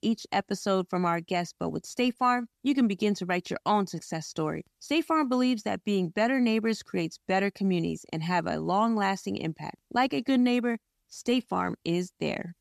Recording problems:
none

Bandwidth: 14 kHz